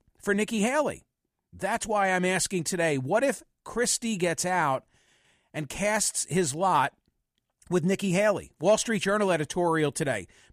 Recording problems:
none

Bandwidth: 14.5 kHz